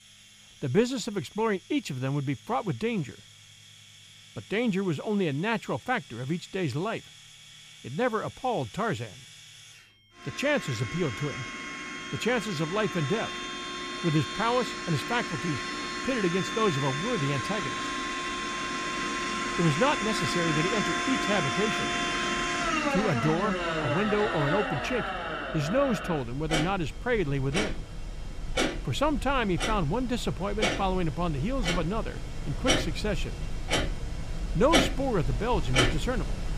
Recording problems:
household noises; loud; throughout; 1 dB below the speech
high-pitched whine; faint; throughout; 3 kHz, 30 dB below the speech

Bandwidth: 15 kHz